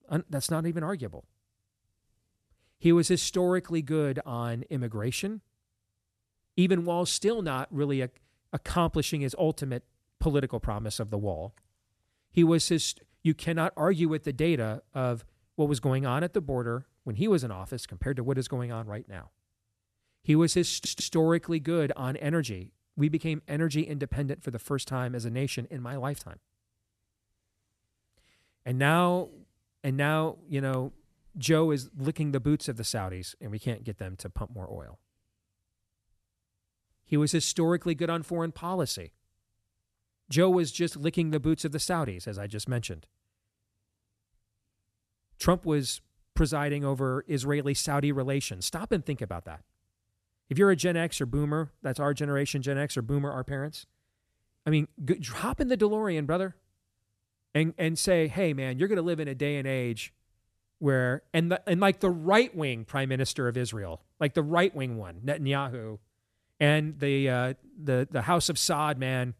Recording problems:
audio stuttering; at 21 s

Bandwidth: 13.5 kHz